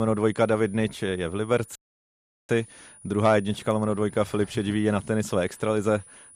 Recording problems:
high-pitched whine; faint; throughout; 9.5 kHz, 25 dB below the speech
abrupt cut into speech; at the start
audio cutting out; at 2 s for 0.5 s

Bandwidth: 14.5 kHz